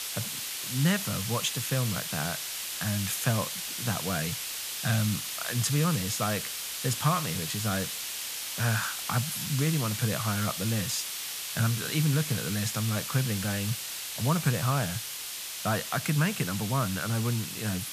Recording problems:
hiss; loud; throughout; 3 dB below the speech

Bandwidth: 14.5 kHz